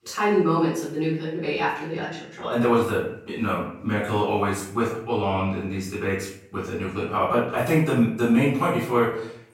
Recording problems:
off-mic speech; far
room echo; noticeable; dies away in 0.6 s

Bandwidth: 16 kHz